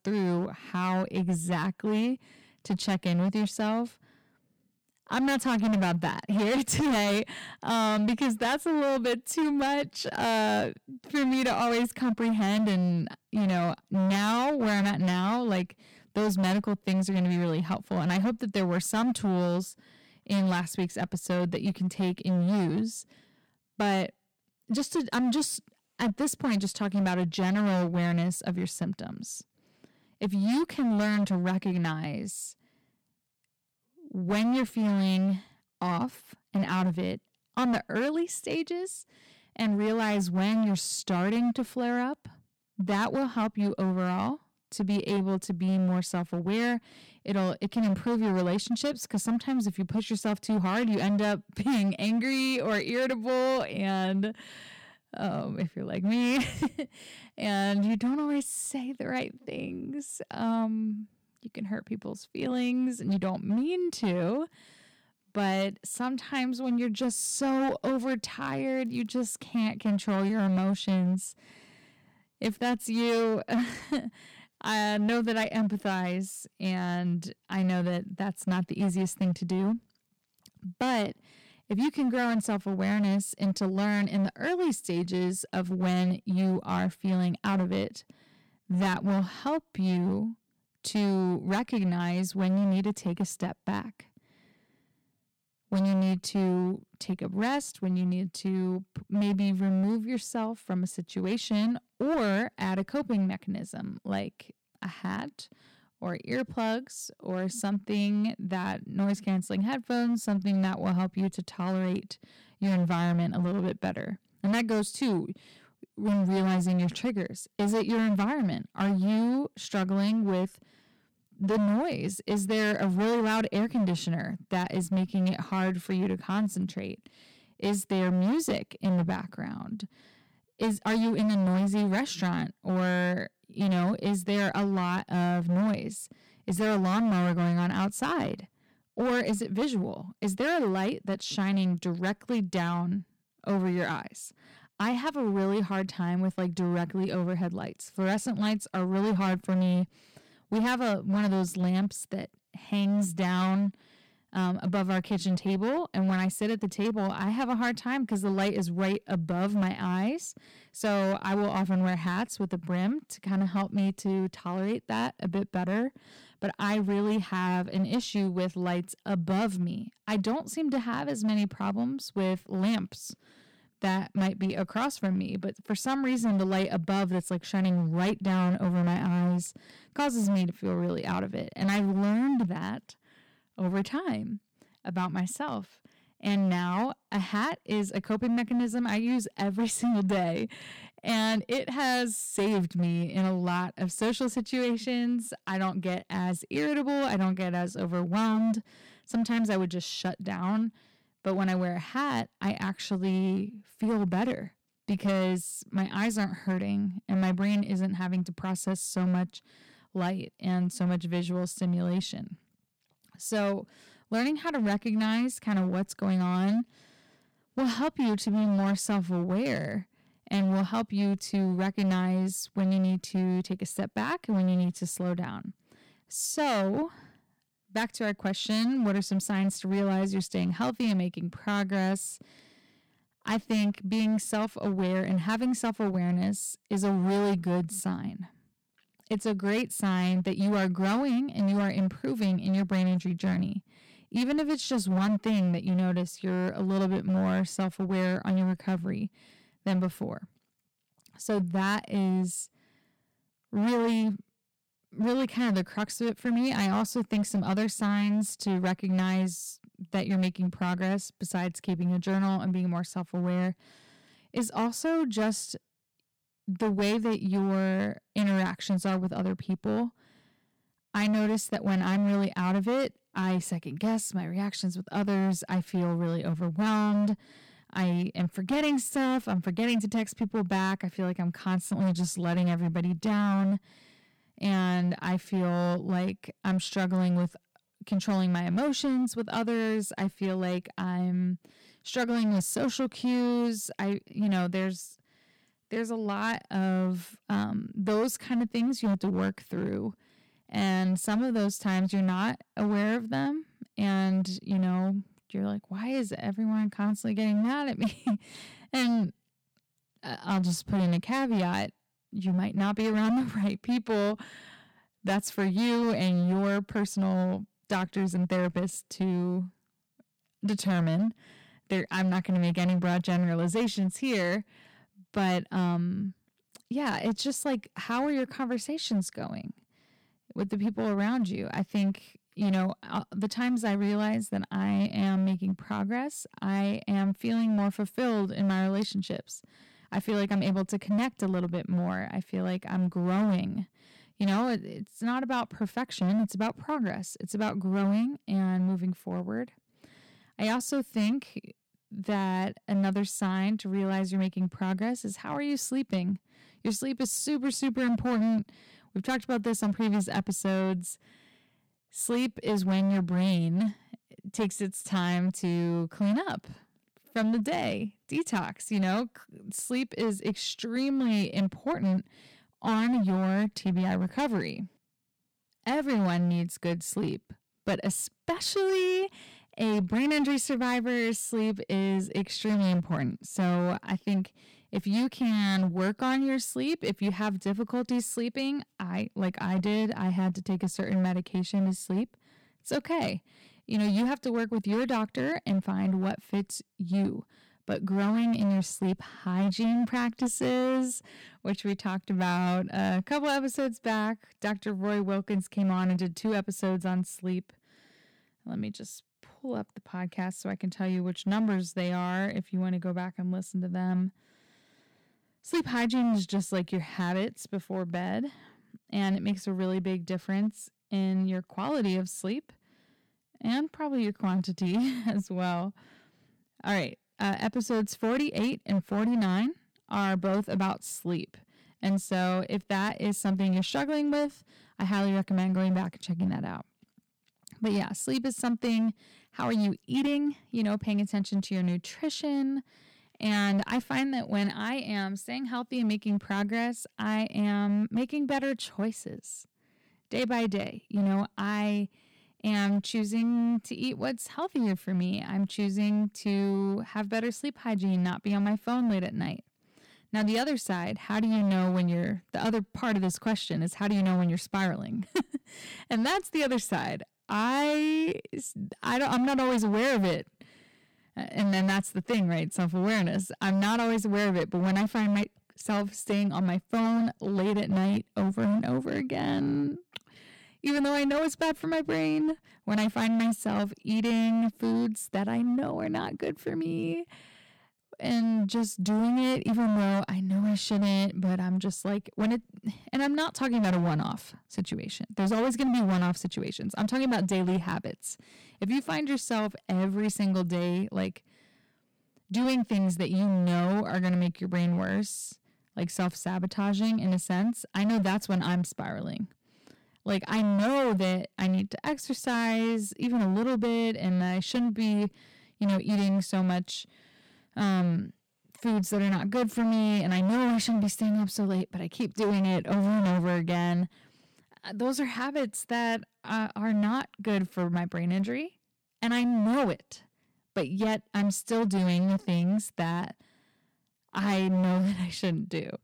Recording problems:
distortion; slight; 14% of the sound clipped

